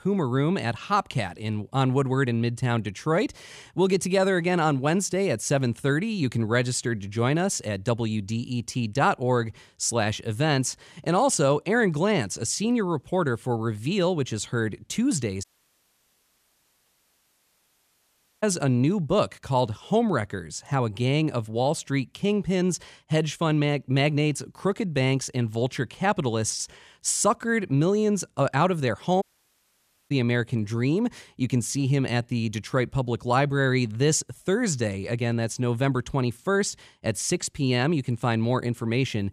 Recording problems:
audio cutting out; at 15 s for 3 s and at 29 s for 1 s

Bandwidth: 14.5 kHz